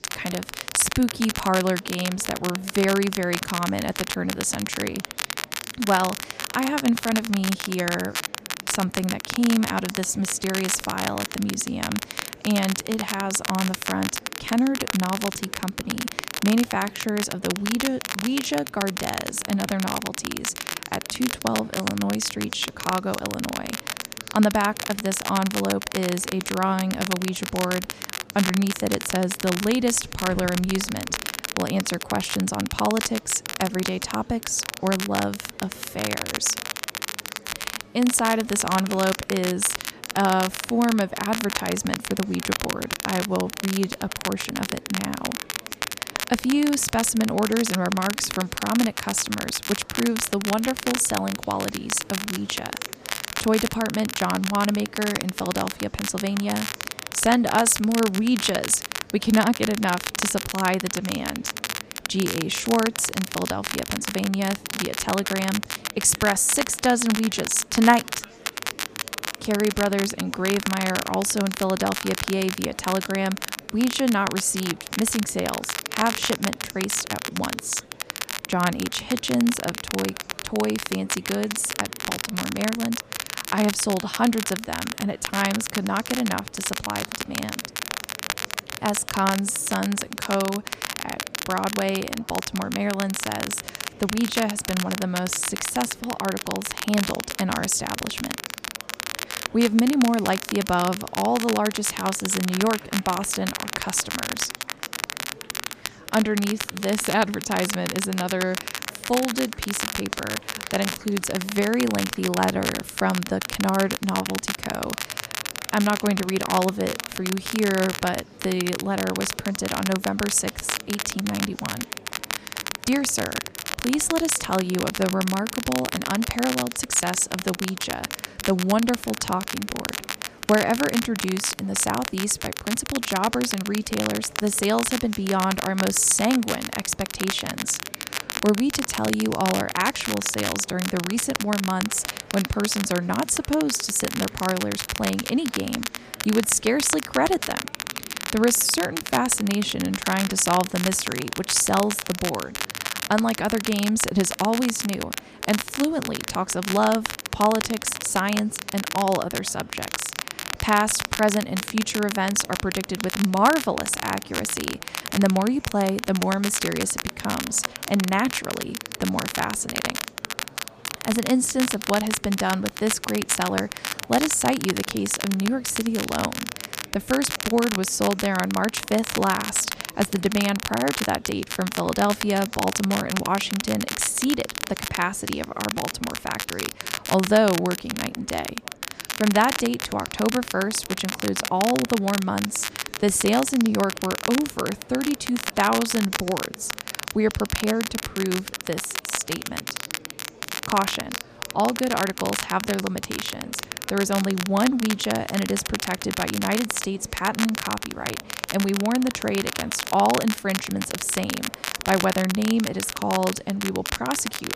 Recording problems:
crackle, like an old record; loud; 5 dB below the speech
murmuring crowd; faint; throughout; 20 dB below the speech

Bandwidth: 14.5 kHz